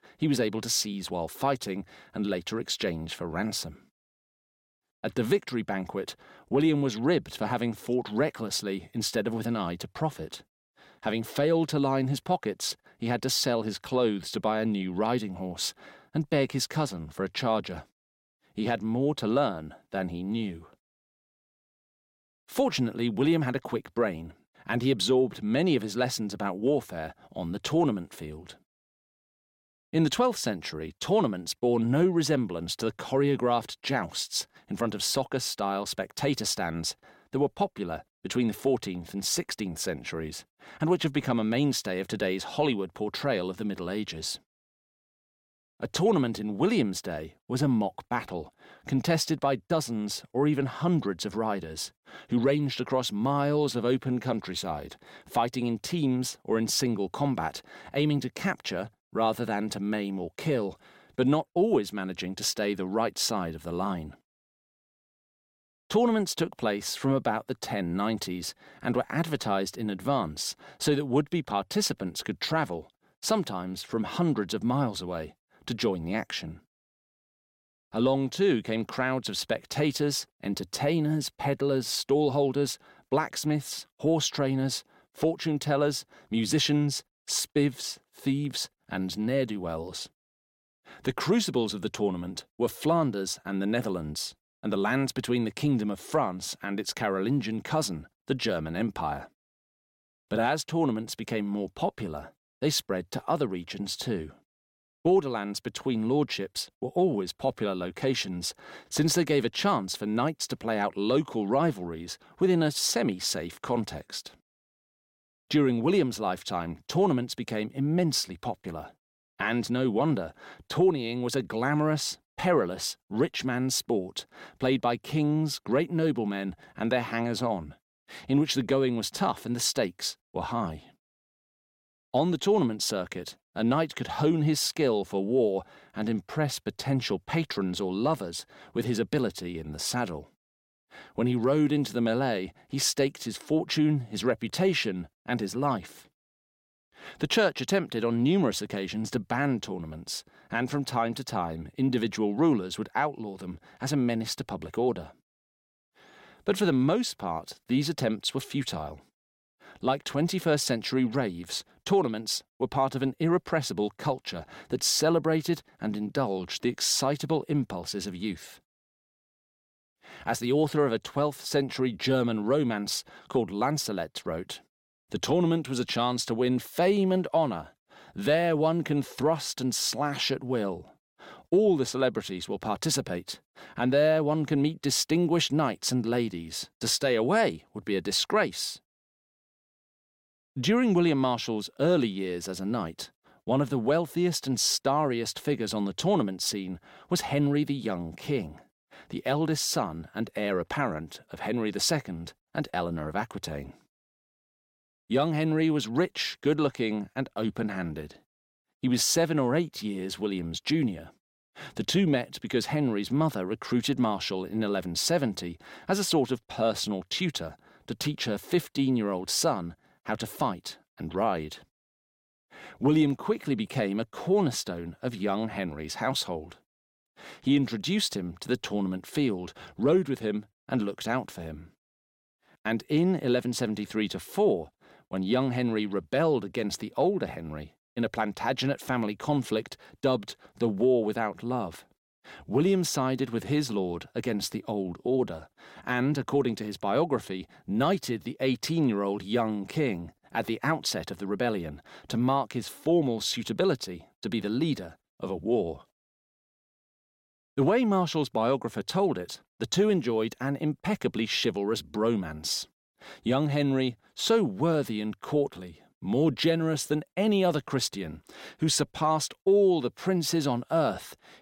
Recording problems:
none

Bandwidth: 16.5 kHz